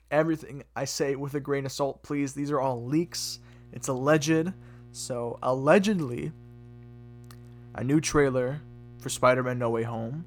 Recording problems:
electrical hum; faint; from 2.5 s on; 60 Hz, 30 dB below the speech

